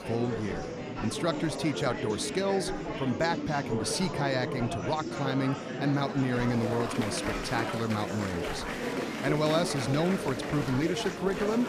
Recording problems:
murmuring crowd; loud; throughout; 3 dB below the speech

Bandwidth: 15 kHz